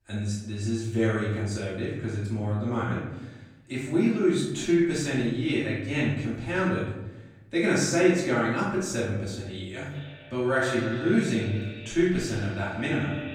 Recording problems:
echo of what is said; strong; from 10 s on; 140 ms later, 10 dB below the speech
off-mic speech; far
room echo; noticeable; dies away in 0.9 s

